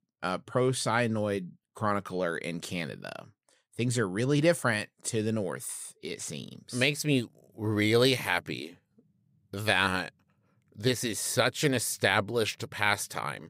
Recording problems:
none

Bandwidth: 15.5 kHz